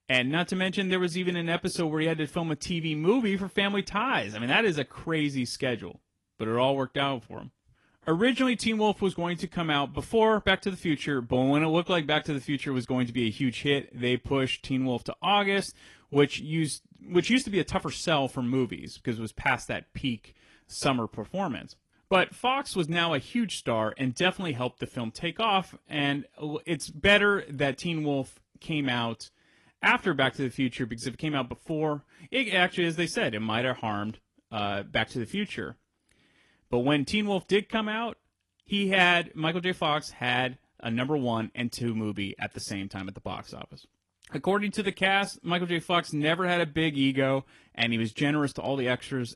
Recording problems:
garbled, watery; slightly; nothing above 11 kHz

